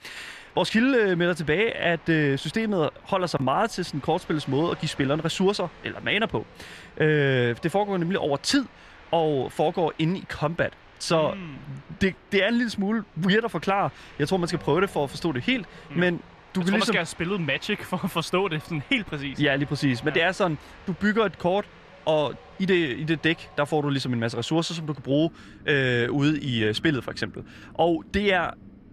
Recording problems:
wind in the background; faint; throughout; 25 dB below the speech

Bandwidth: 14.5 kHz